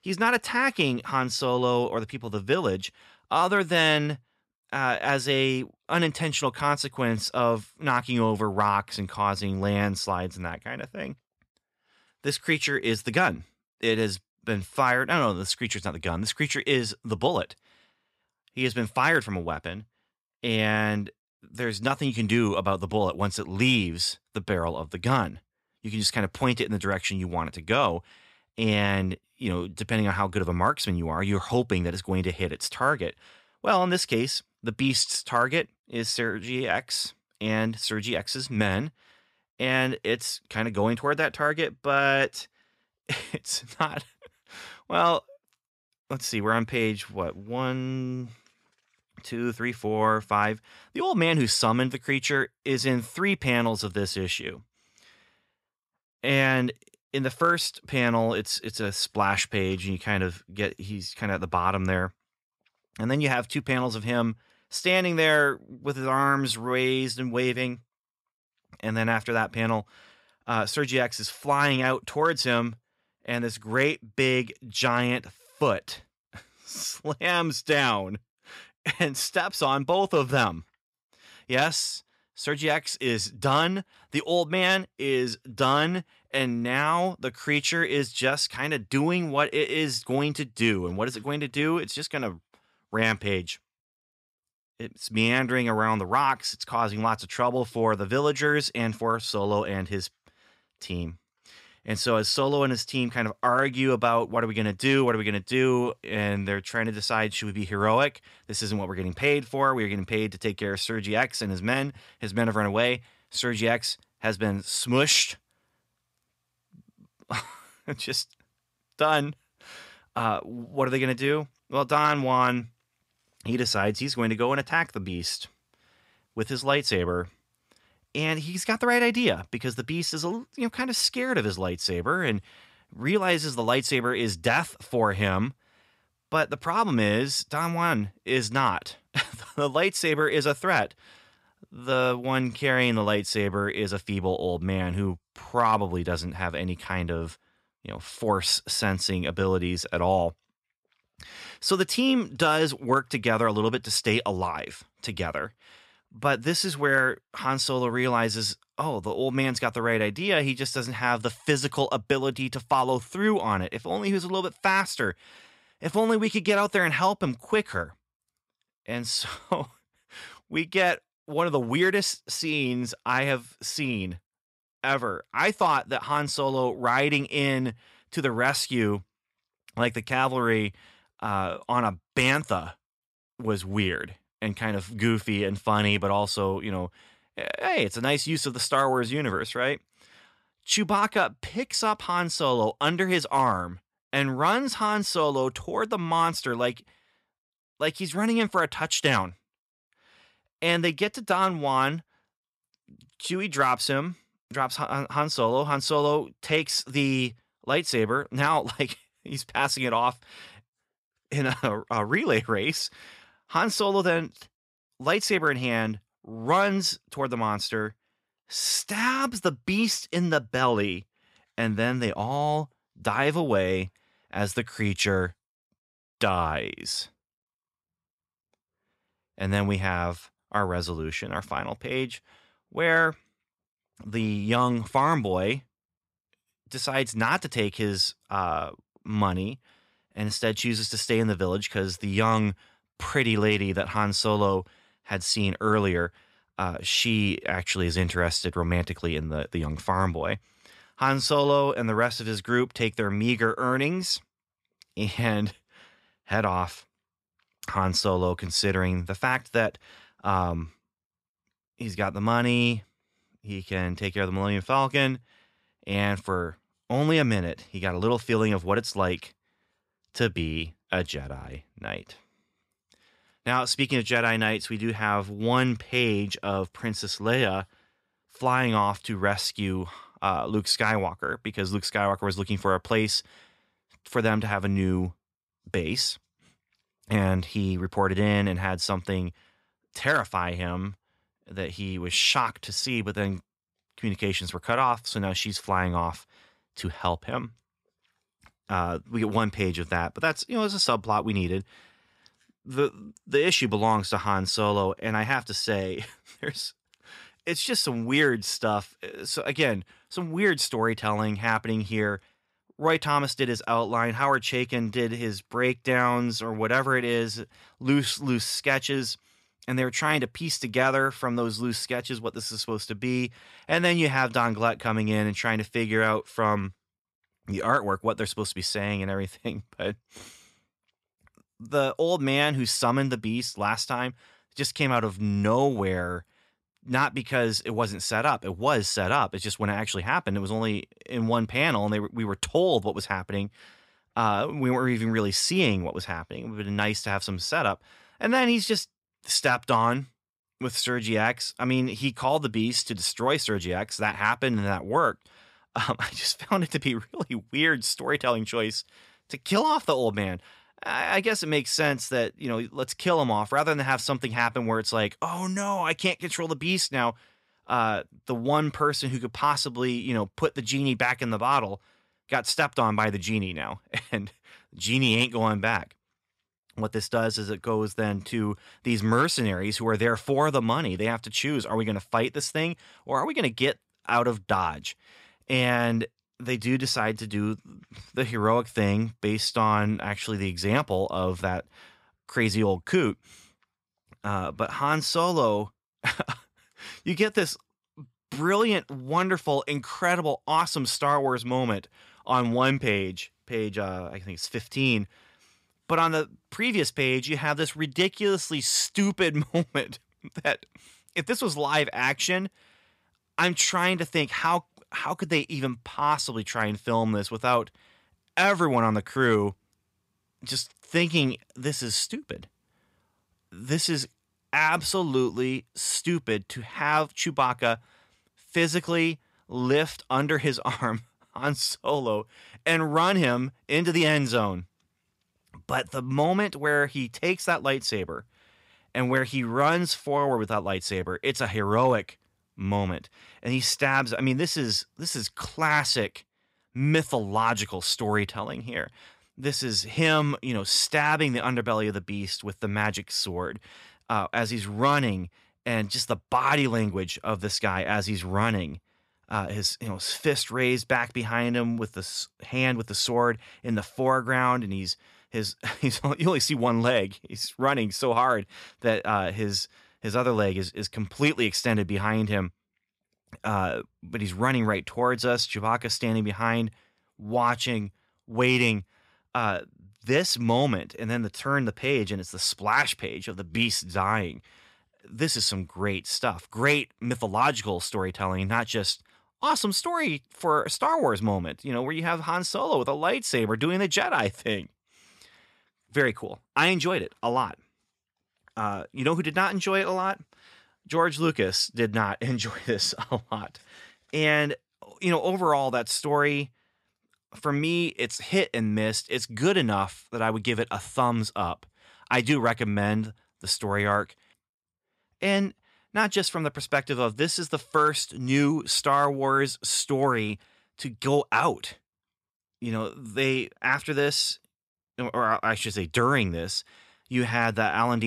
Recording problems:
abrupt cut into speech; at the end

